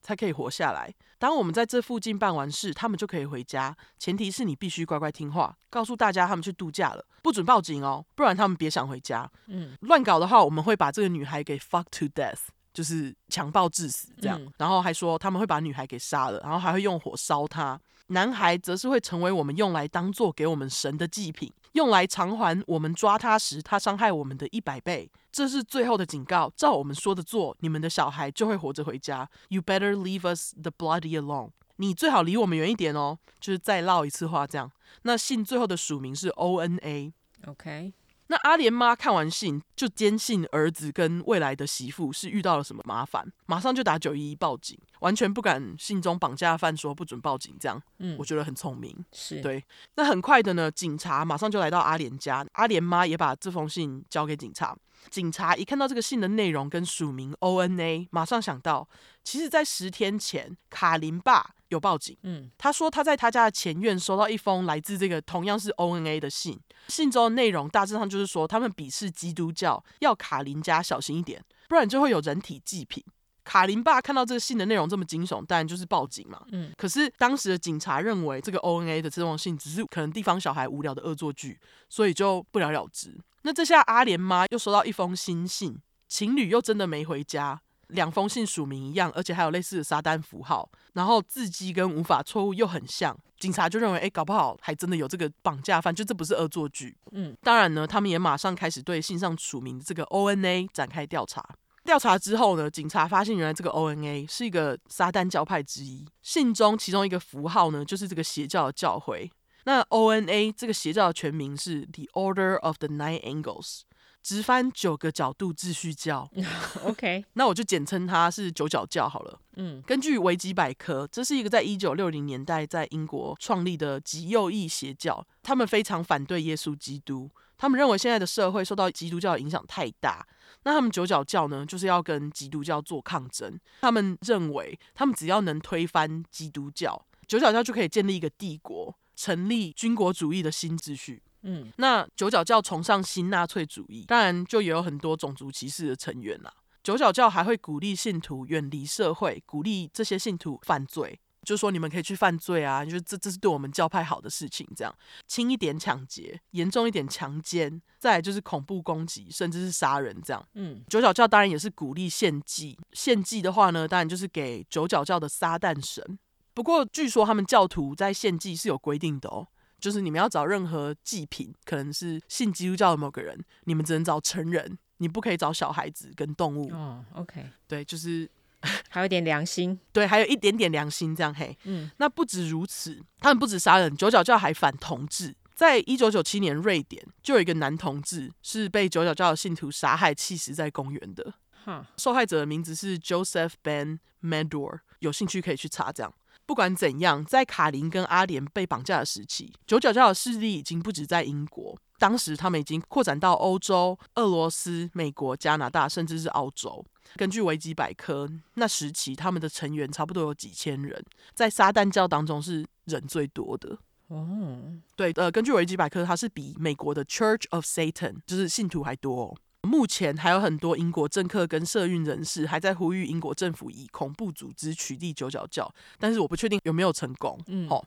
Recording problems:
none

